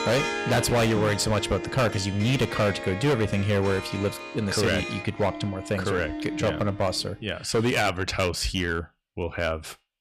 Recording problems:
distortion; heavy; 11% of the sound clipped
background music; loud; until 7 s; 9 dB below the speech

